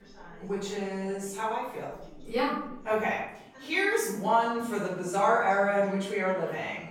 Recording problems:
off-mic speech; far
room echo; noticeable; dies away in 0.6 s
background chatter; faint; throughout; 4 voices, 20 dB below the speech

